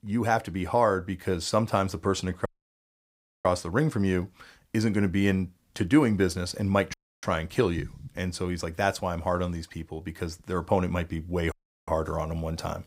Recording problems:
audio cutting out; at 2.5 s for 1 s, at 7 s and at 12 s

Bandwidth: 15.5 kHz